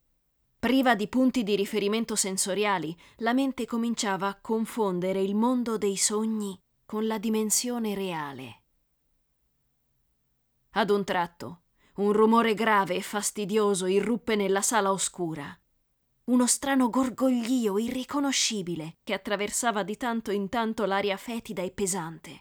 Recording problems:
none

